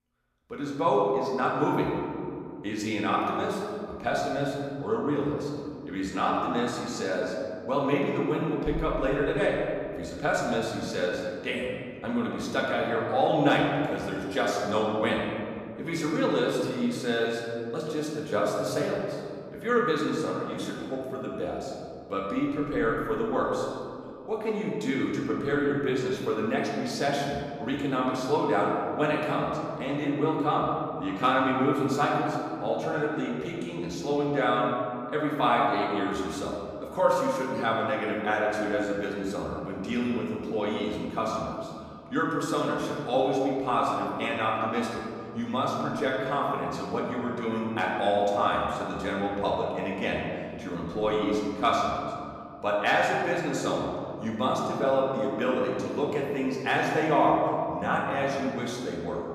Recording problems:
off-mic speech; far
room echo; noticeable; dies away in 2.2 s

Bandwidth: 15 kHz